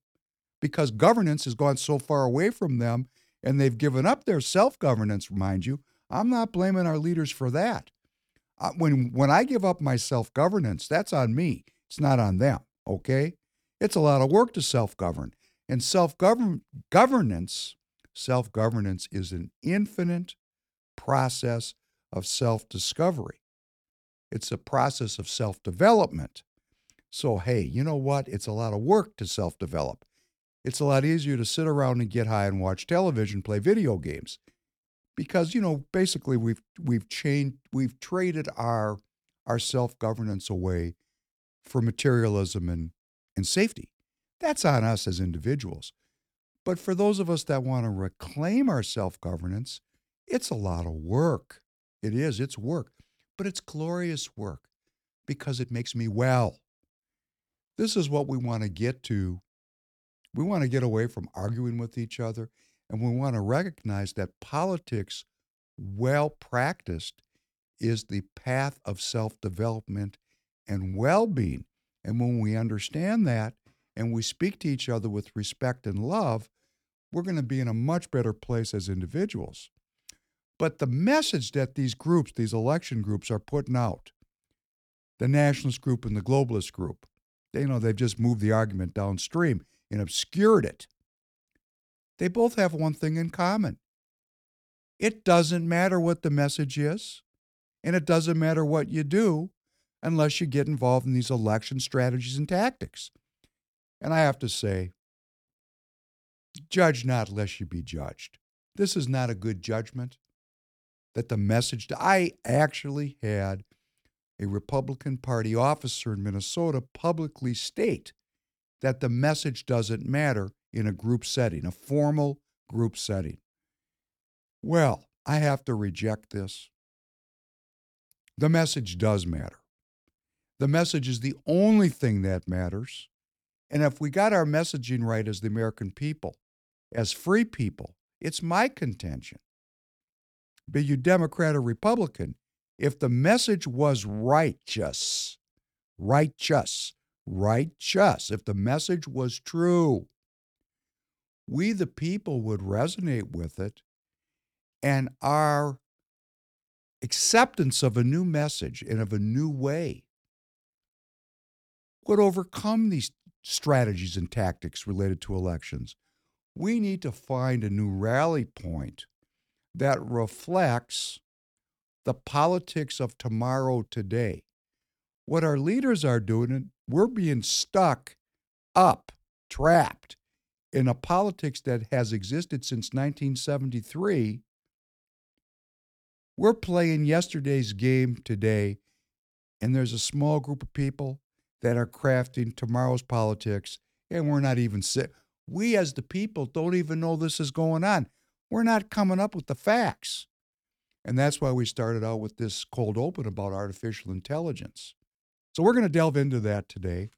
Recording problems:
uneven, jittery; strongly; from 0.5 s to 3:26

